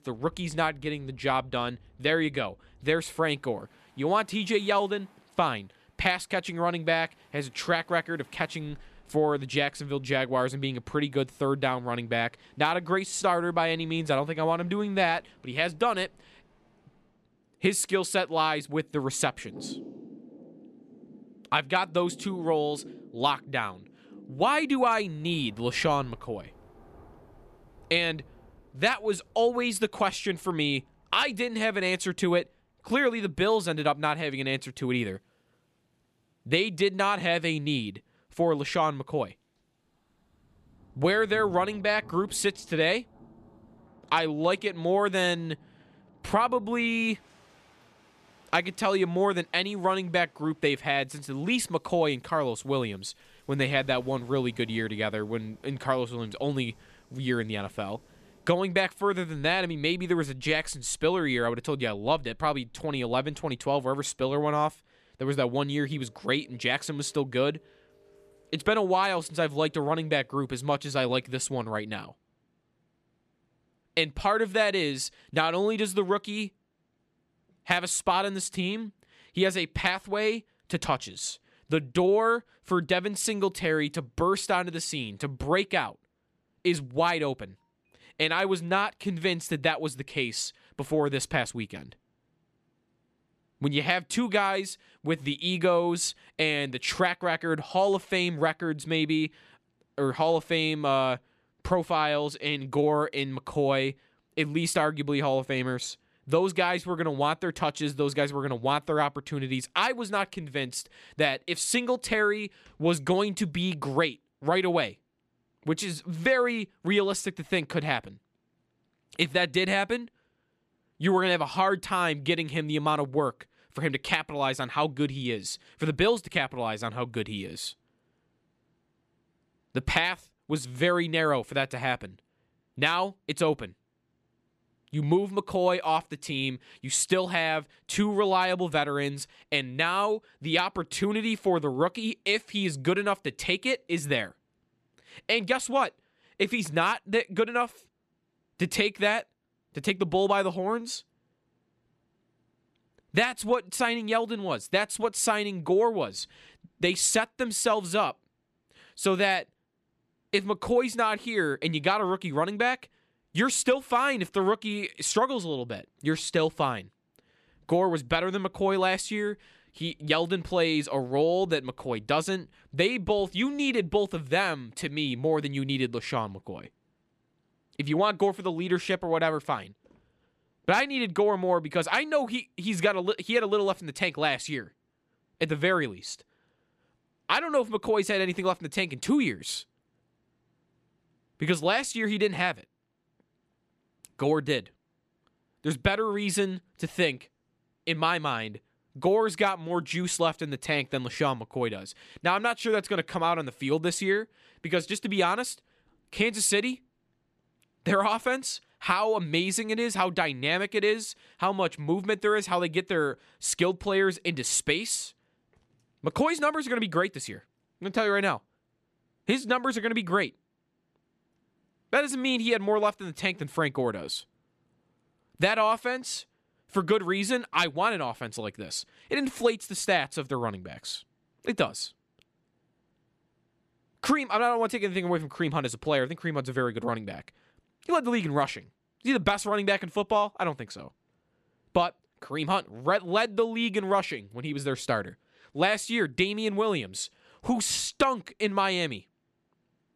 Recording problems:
rain or running water; faint; until 1:11; 25 dB below the speech

